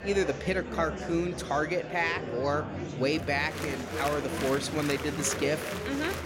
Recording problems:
murmuring crowd; loud; throughout; 5 dB below the speech

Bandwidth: 16 kHz